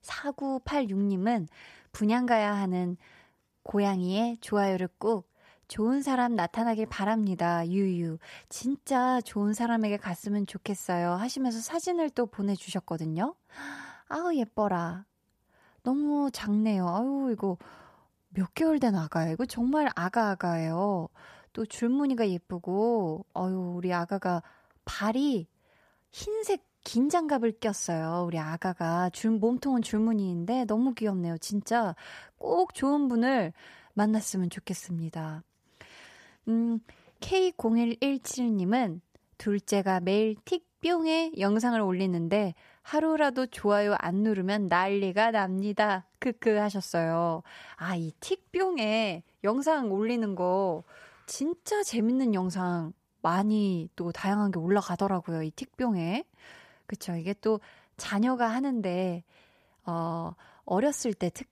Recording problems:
none

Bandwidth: 14.5 kHz